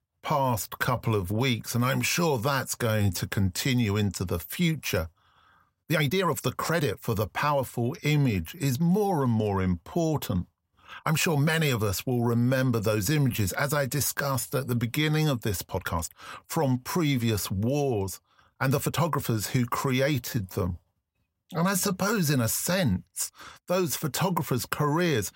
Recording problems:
uneven, jittery; strongly; from 0.5 to 24 s

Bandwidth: 16 kHz